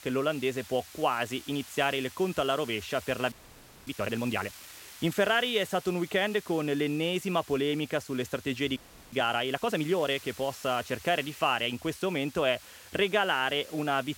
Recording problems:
hiss; noticeable; throughout; 20 dB below the speech
audio freezing; at 3.5 s for 0.5 s and at 9 s

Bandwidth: 16.5 kHz